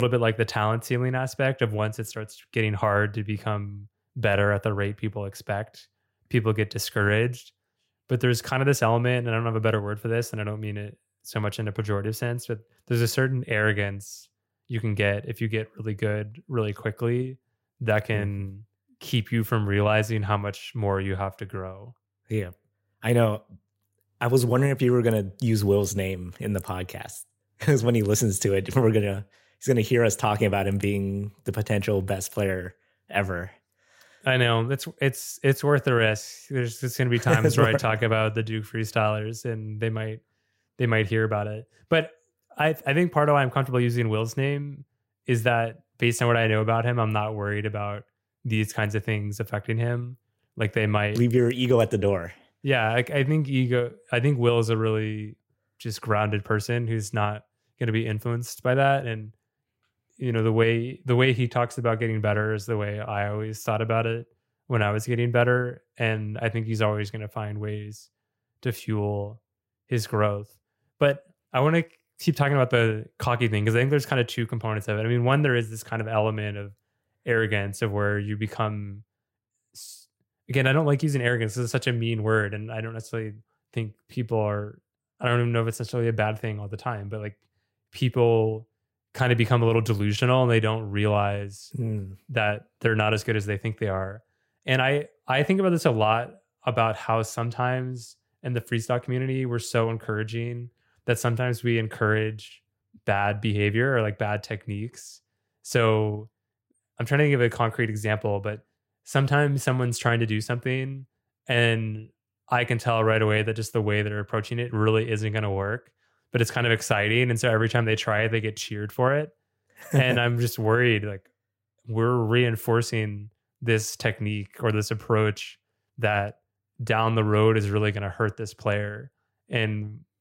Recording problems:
abrupt cut into speech; at the start

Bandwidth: 16 kHz